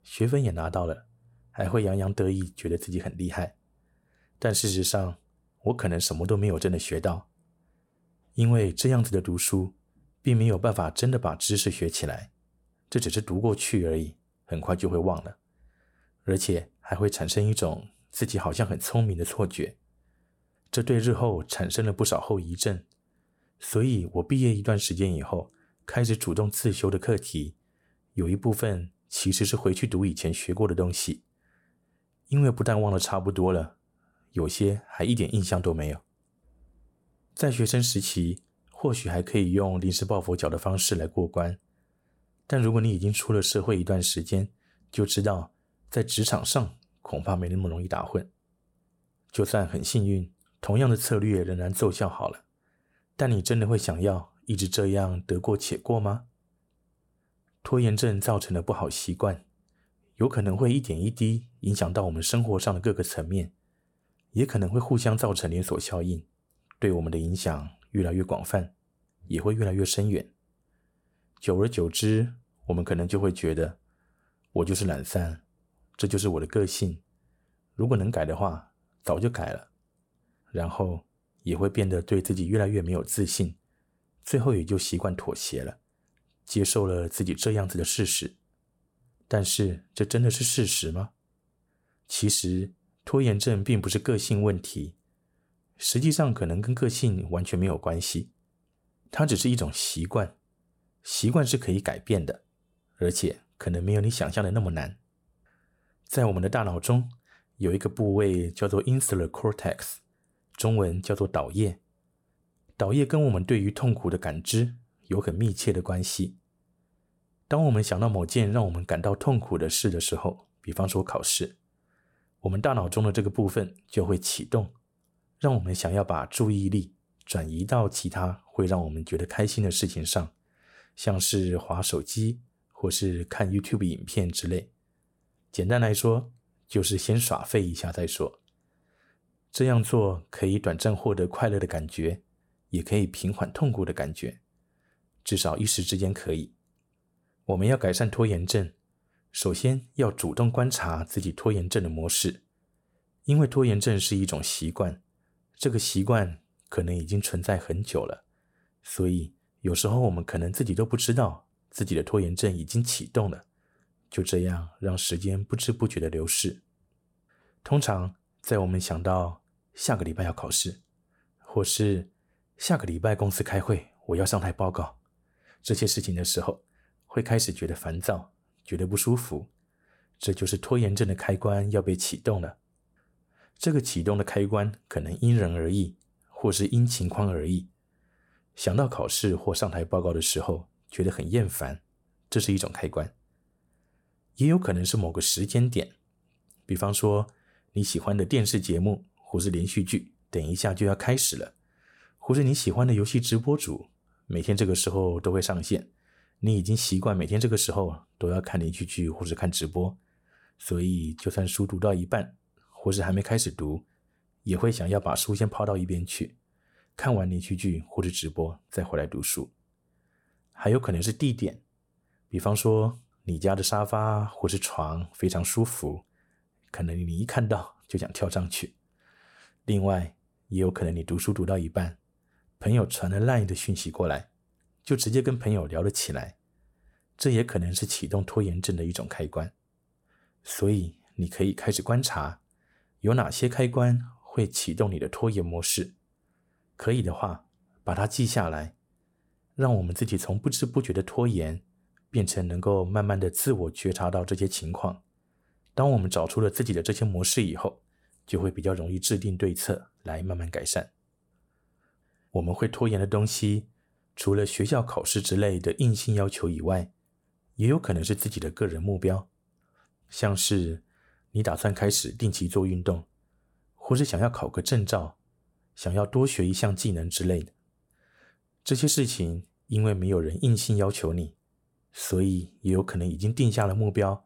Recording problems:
none

